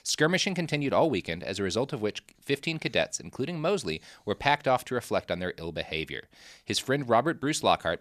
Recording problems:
none

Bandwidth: 14.5 kHz